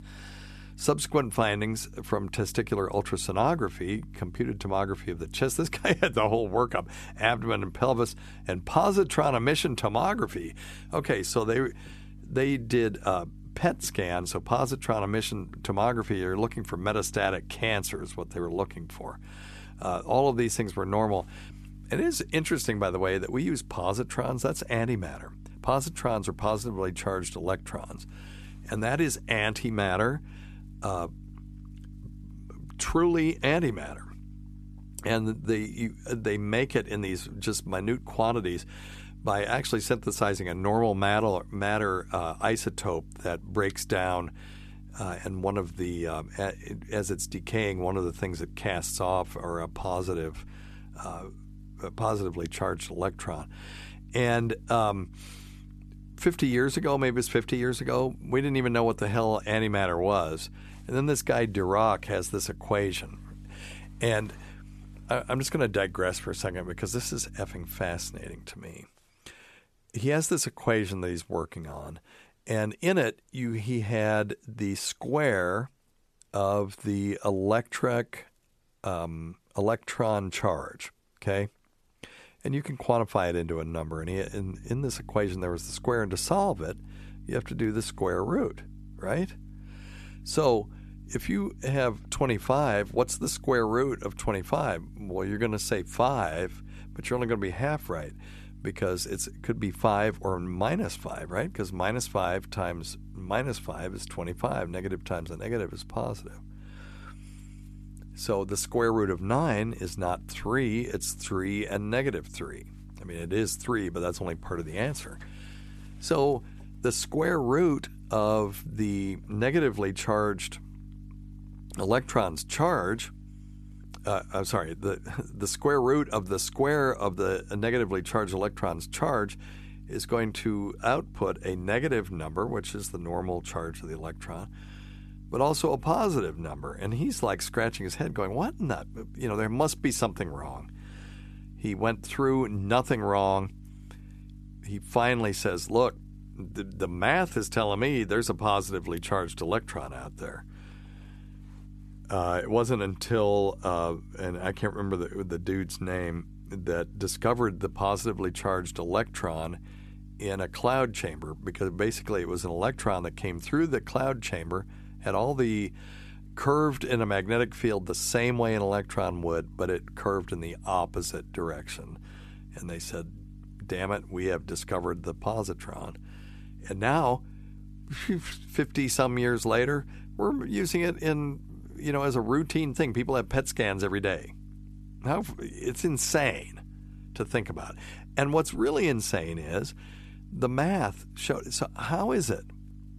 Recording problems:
electrical hum; faint; until 1:08 and from 1:24 on; 50 Hz, 30 dB below the speech

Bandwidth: 13.5 kHz